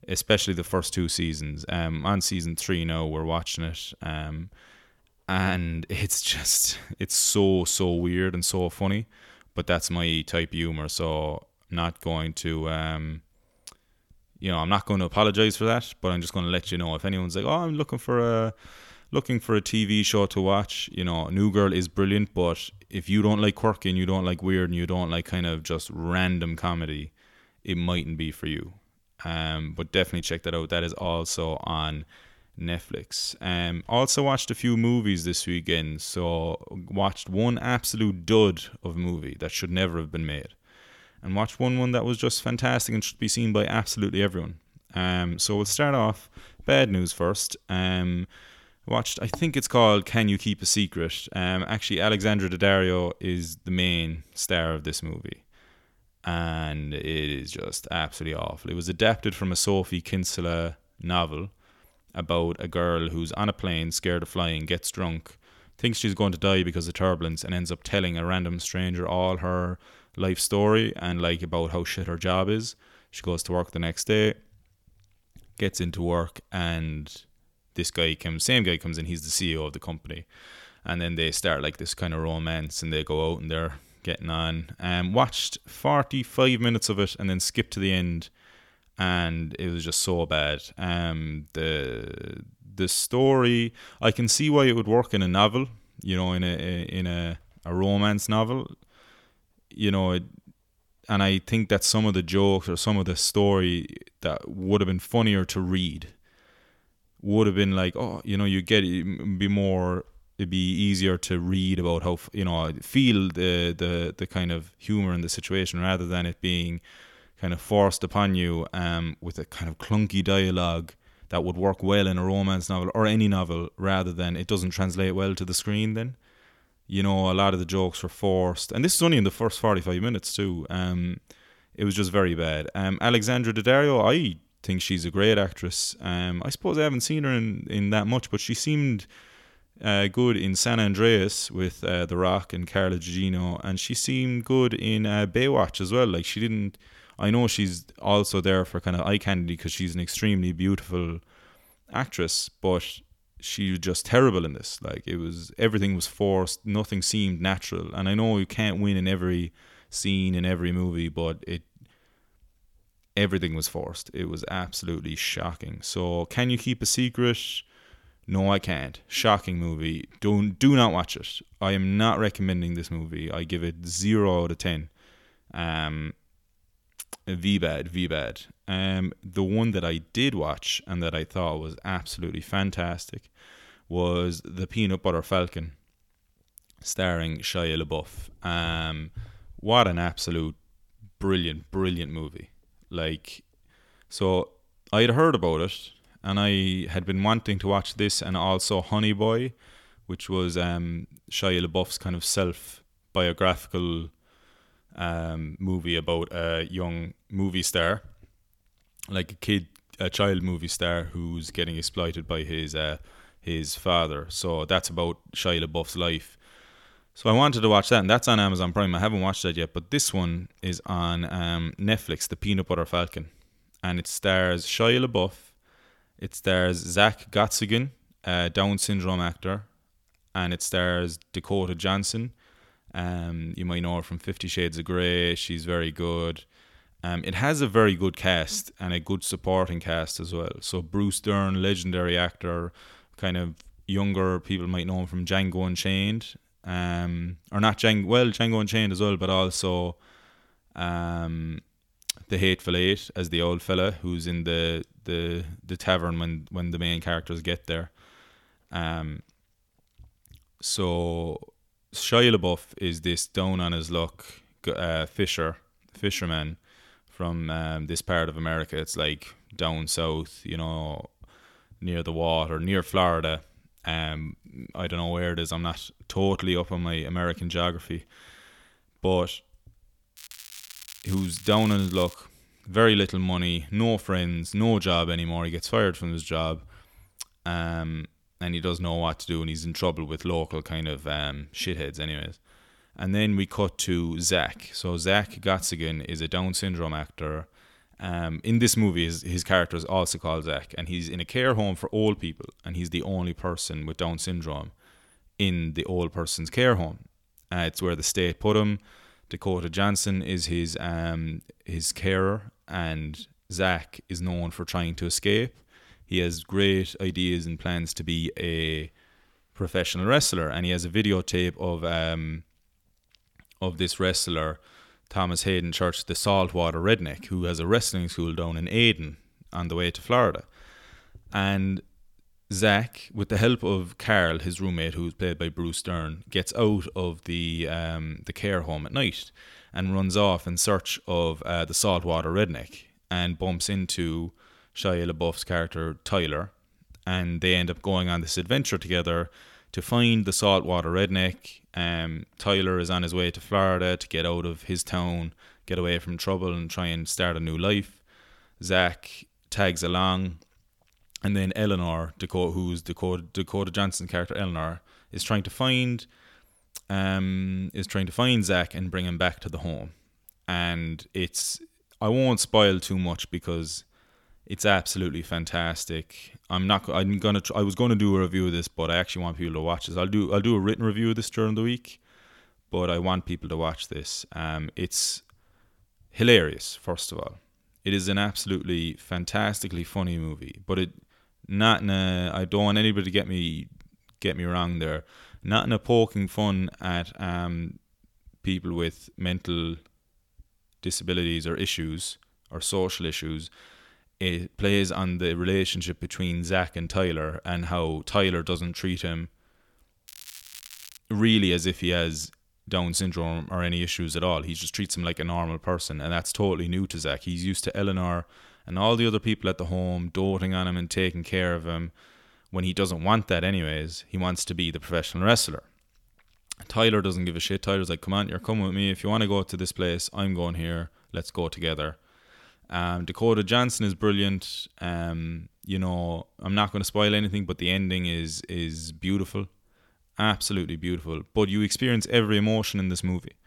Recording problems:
crackling; noticeable; from 4:40 to 4:42 and at 6:50; 15 dB below the speech

